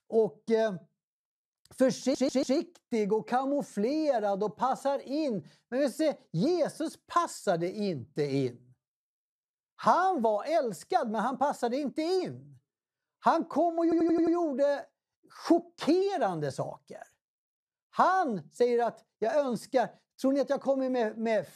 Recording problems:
audio stuttering; at 2 s and at 14 s

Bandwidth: 13.5 kHz